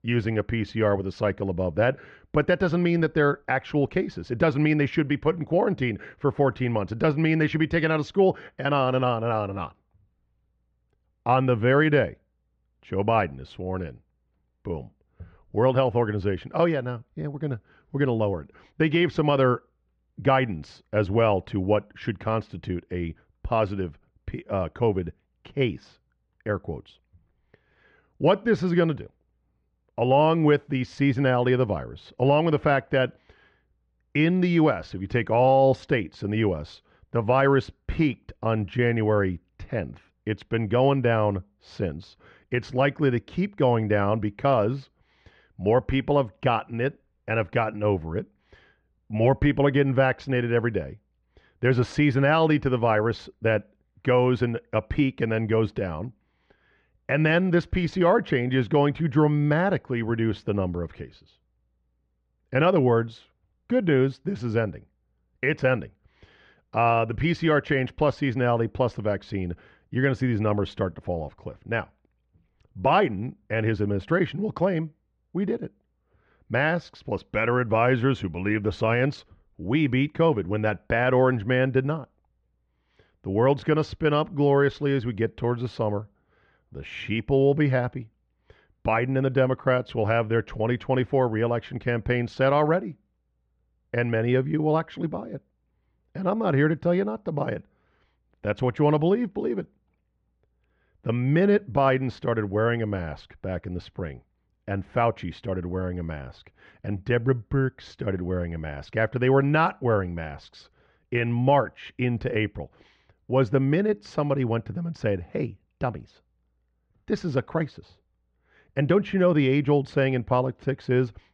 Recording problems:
muffled; very; fading above 1.5 kHz

